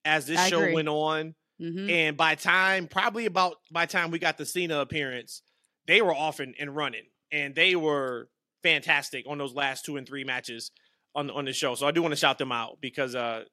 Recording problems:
none

